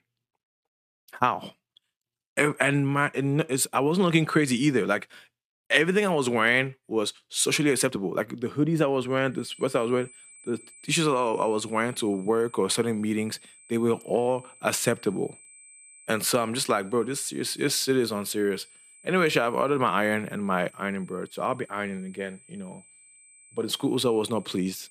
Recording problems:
high-pitched whine; faint; from 9.5 s on; 8 kHz, 25 dB below the speech

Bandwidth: 14.5 kHz